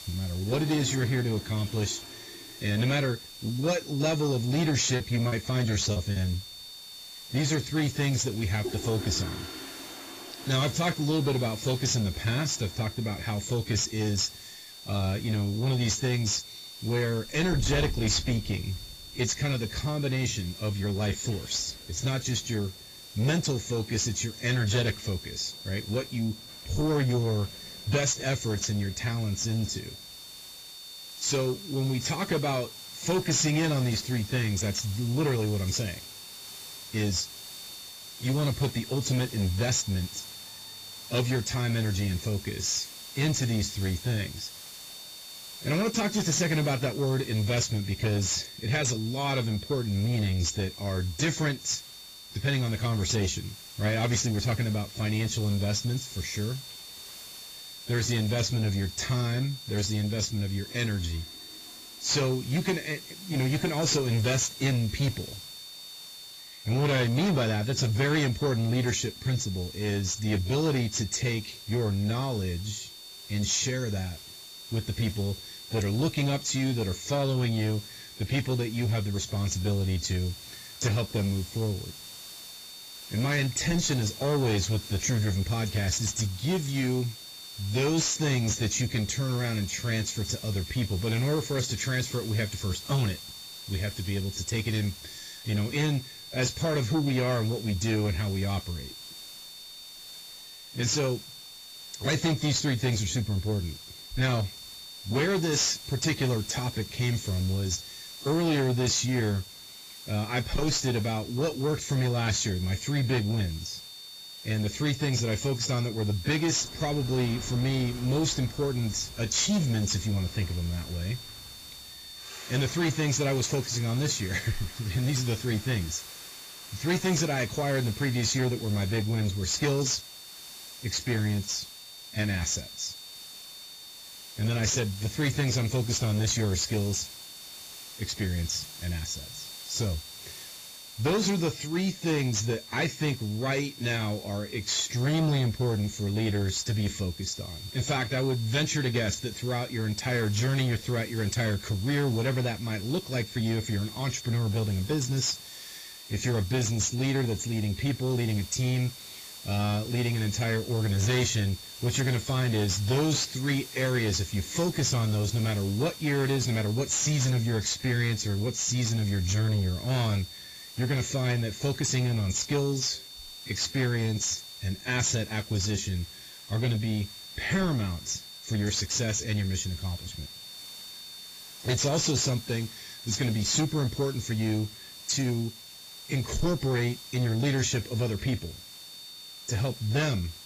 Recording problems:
garbled, watery; badly; nothing above 7.5 kHz
distortion; slight; 10 dB below the speech
high-pitched whine; noticeable; throughout; 4.5 kHz, 15 dB below the speech
hiss; noticeable; throughout; 15 dB below the speech
household noises; faint; throughout; 20 dB below the speech
choppy; very; from 5 to 6 s; 10% of the speech affected

